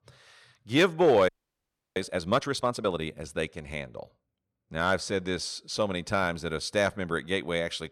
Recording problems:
audio freezing; at 1.5 s for 0.5 s

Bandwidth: 17.5 kHz